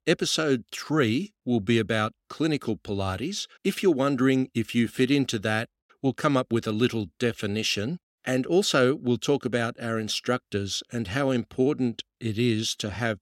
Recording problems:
none

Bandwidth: 16.5 kHz